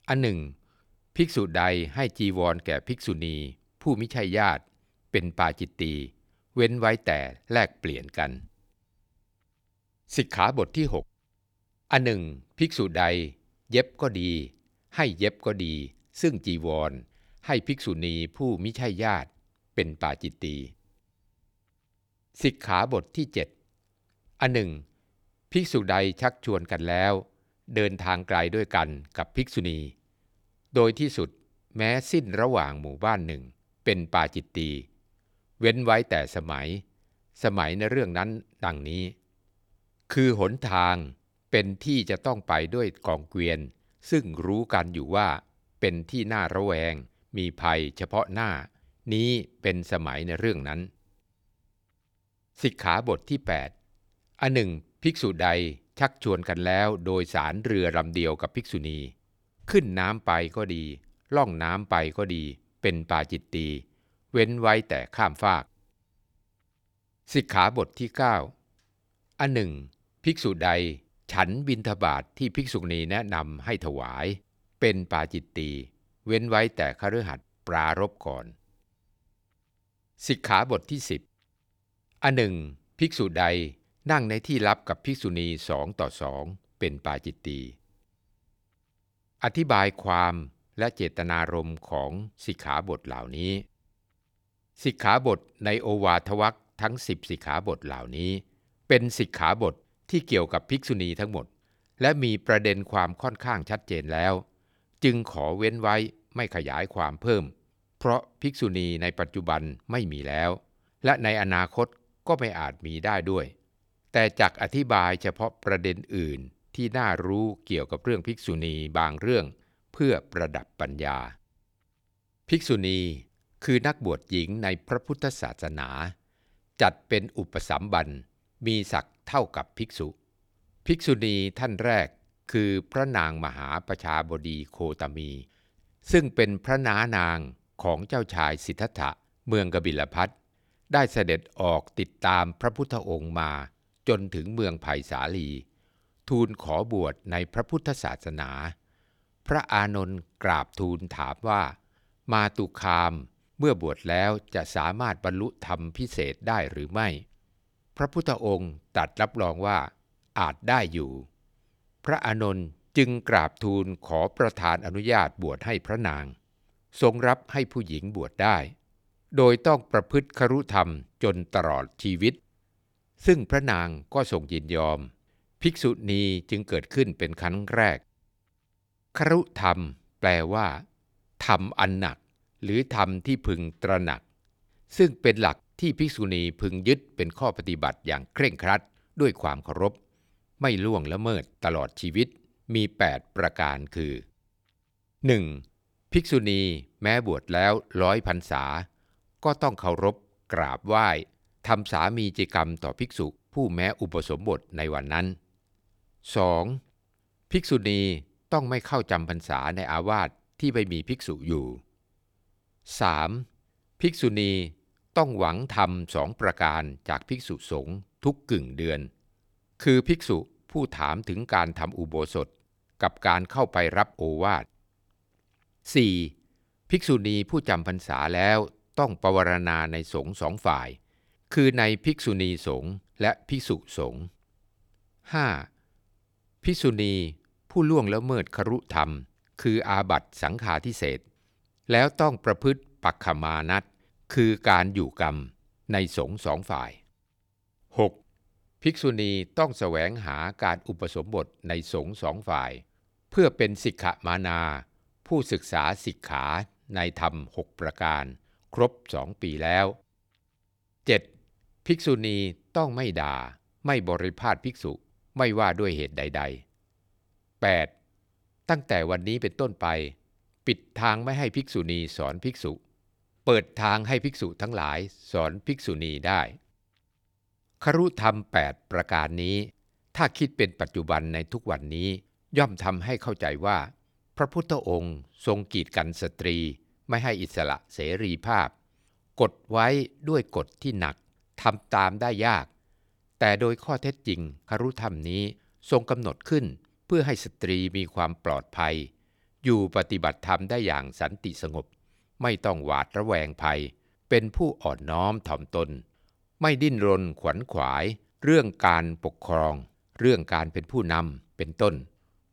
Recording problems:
none

